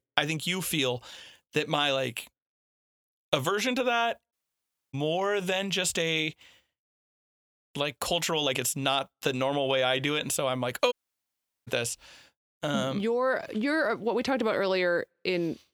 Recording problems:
uneven, jittery; strongly; from 1 to 13 s
audio cutting out; at 4.5 s for 0.5 s and at 11 s for 0.5 s

